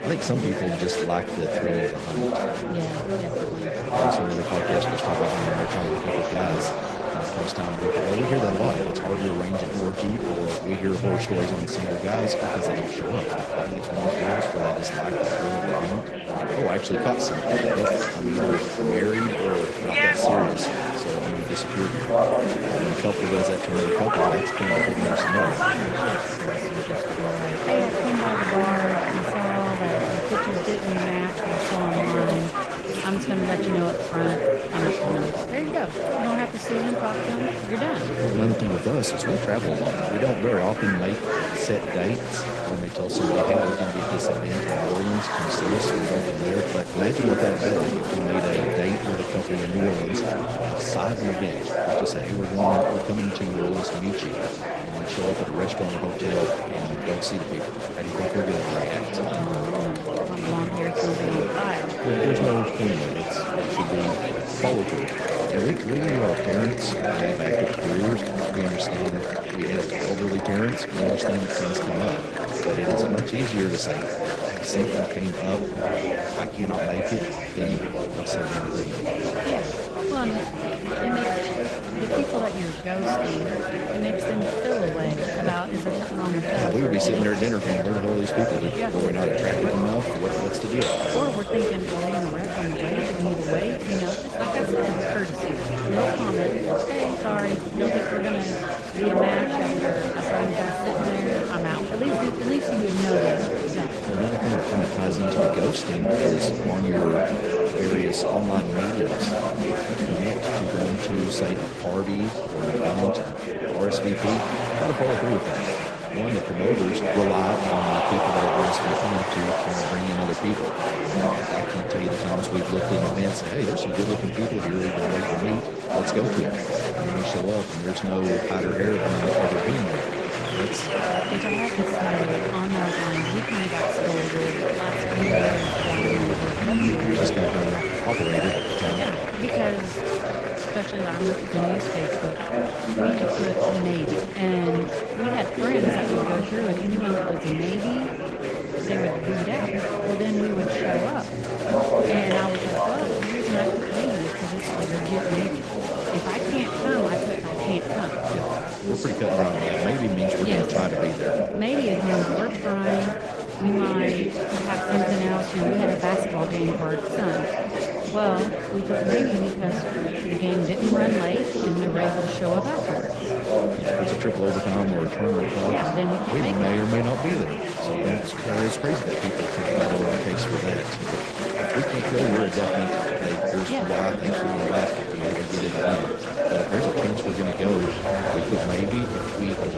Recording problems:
echo of what is said; faint; throughout; 100 ms later, 25 dB below the speech
garbled, watery; slightly
murmuring crowd; very loud; throughout; 2 dB above the speech
household noises; noticeable; throughout; 15 dB below the speech

